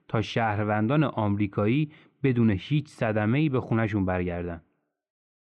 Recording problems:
muffled; very; fading above 2 kHz

